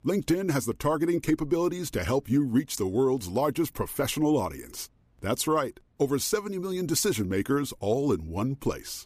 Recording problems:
none

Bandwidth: 15 kHz